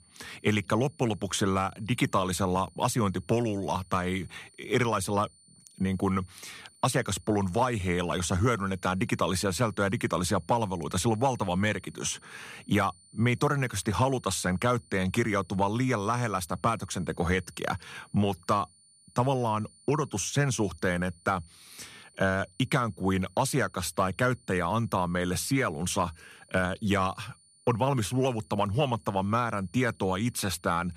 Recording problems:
high-pitched whine; faint; throughout; 9 kHz, 30 dB below the speech

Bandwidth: 14.5 kHz